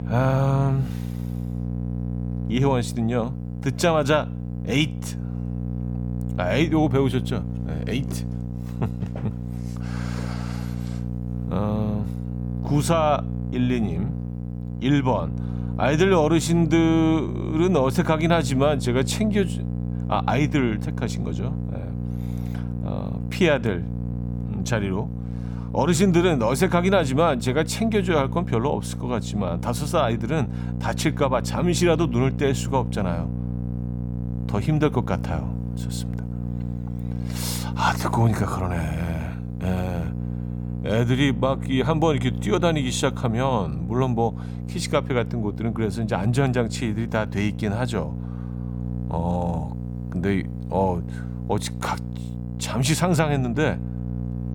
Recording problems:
electrical hum; noticeable; throughout; 60 Hz, 15 dB below the speech

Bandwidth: 18 kHz